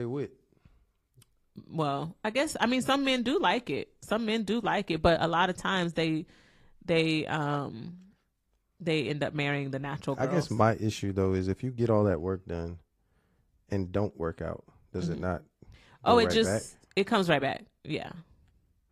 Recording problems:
garbled, watery; slightly
abrupt cut into speech; at the start

